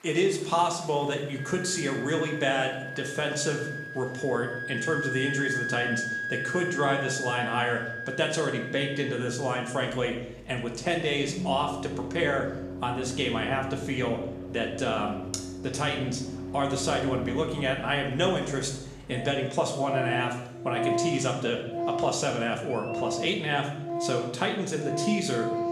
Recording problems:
room echo; slight; dies away in 0.8 s
off-mic speech; somewhat distant
background music; loud; throughout; 5 dB below the speech
murmuring crowd; faint; throughout; 25 dB below the speech

